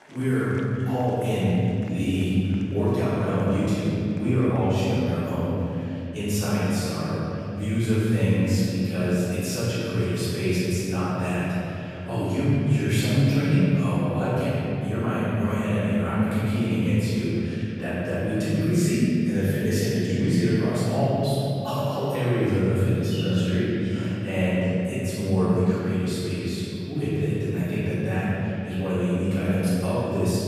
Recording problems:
room echo; strong; dies away in 3 s
off-mic speech; far
murmuring crowd; faint; throughout; 25 dB below the speech

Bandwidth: 14.5 kHz